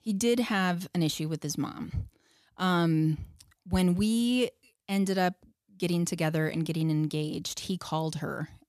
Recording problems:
none

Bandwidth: 14.5 kHz